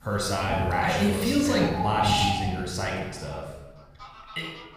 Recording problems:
room echo; noticeable; dies away in 1 s
off-mic speech; somewhat distant
animal sounds; loud; throughout; 4 dB below the speech

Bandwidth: 15 kHz